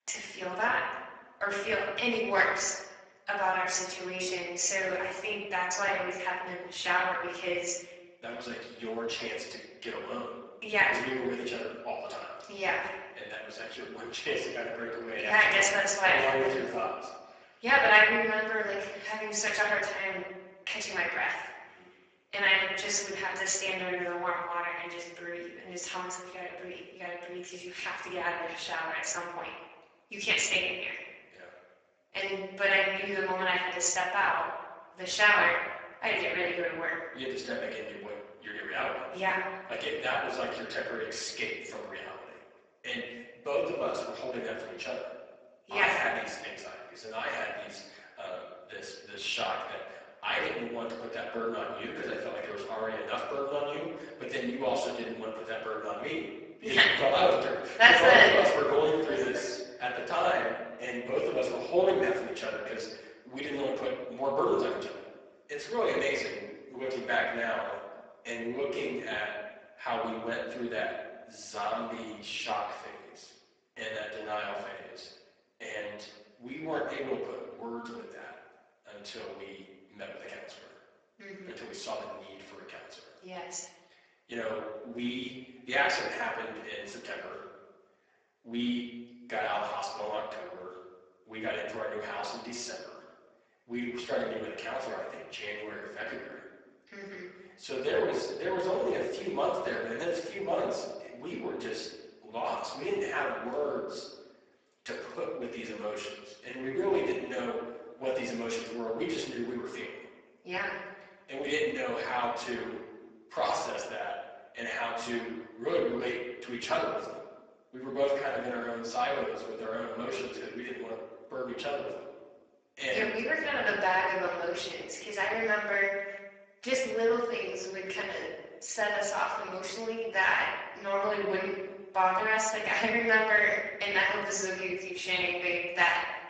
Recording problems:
off-mic speech; far
garbled, watery; badly; nothing above 7.5 kHz
room echo; noticeable; dies away in 1 s
thin; somewhat; fading below 500 Hz

